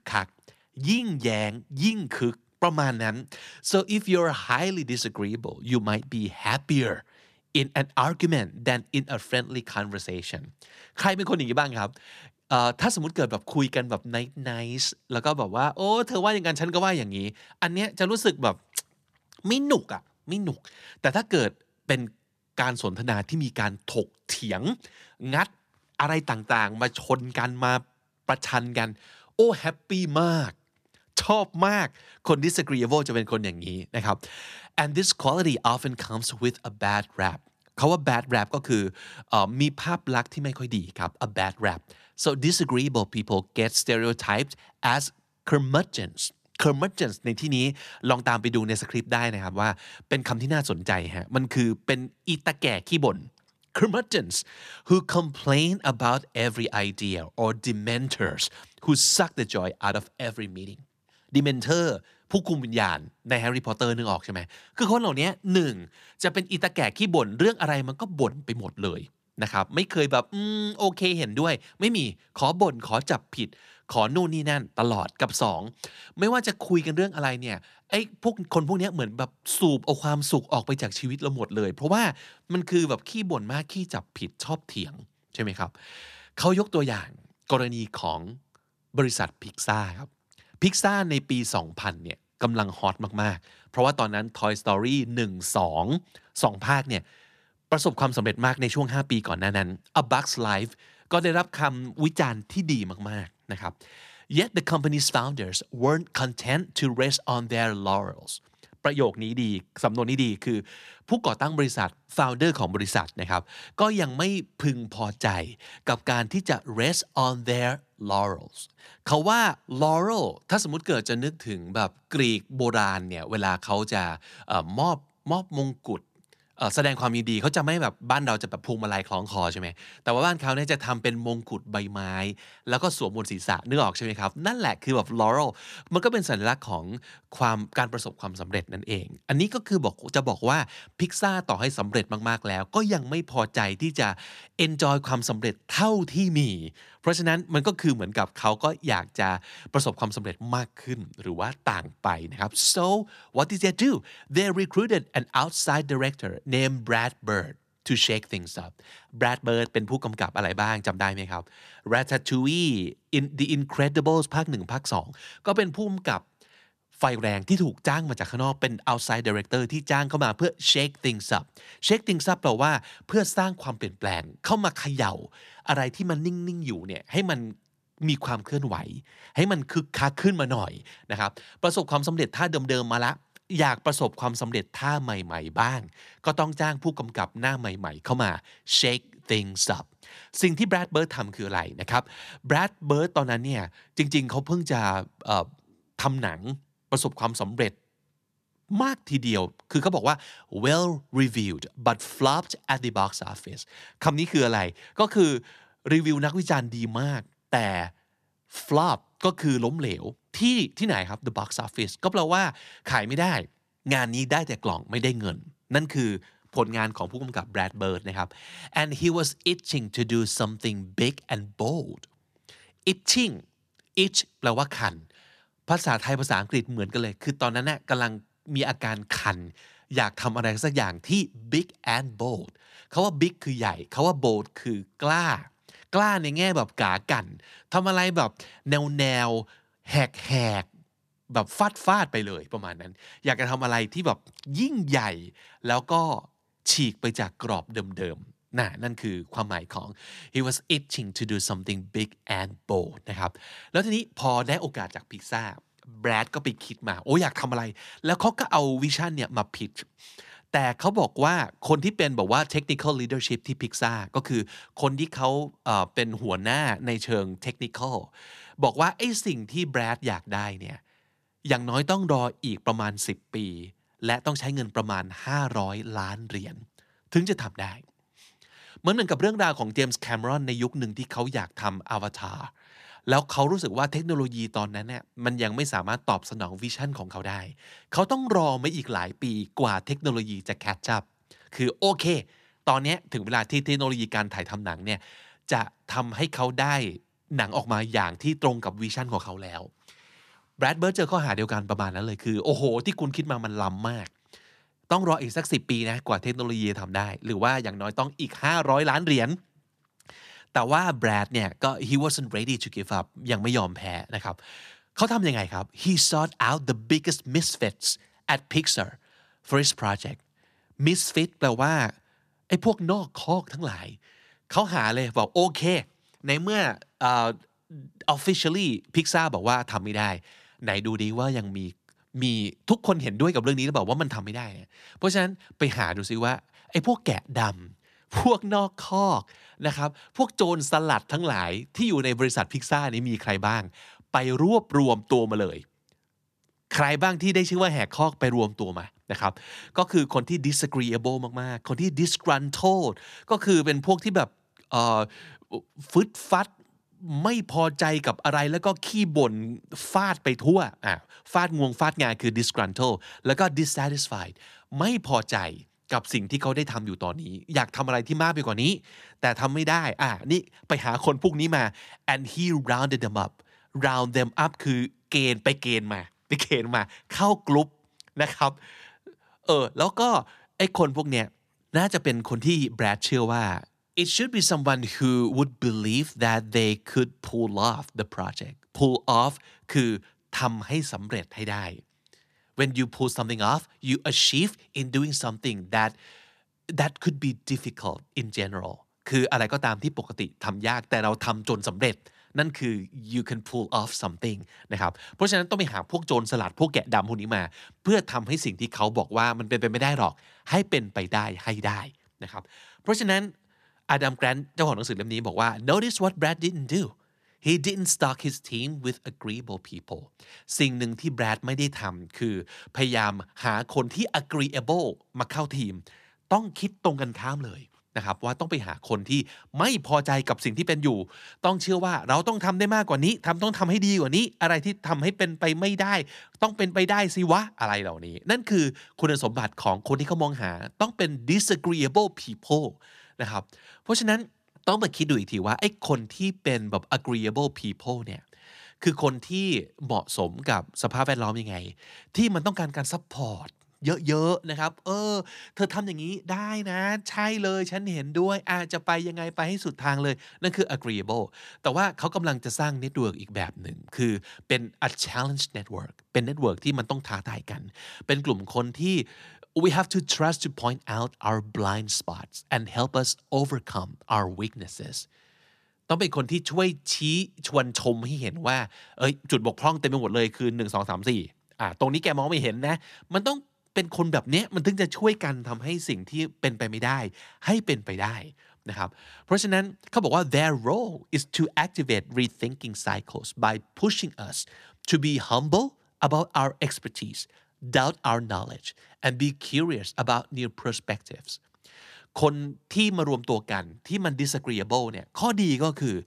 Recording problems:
none

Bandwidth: 14.5 kHz